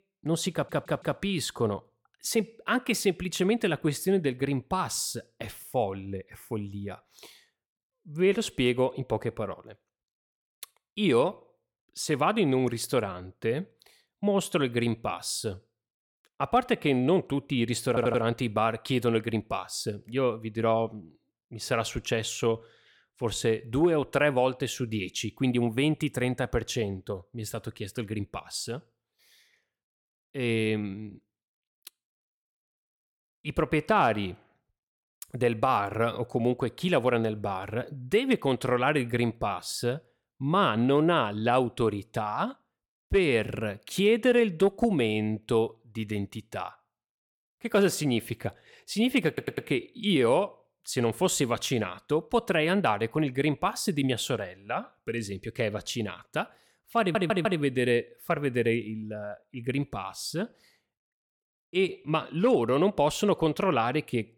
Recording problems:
audio stuttering; 4 times, first at 0.5 s

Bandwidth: 18 kHz